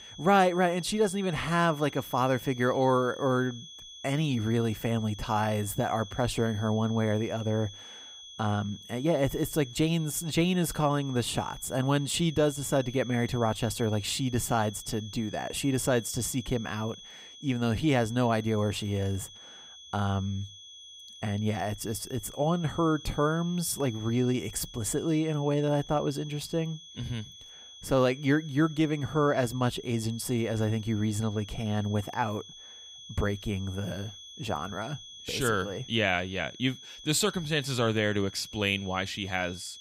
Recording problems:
high-pitched whine; noticeable; throughout; 3.5 kHz, 15 dB below the speech

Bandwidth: 15.5 kHz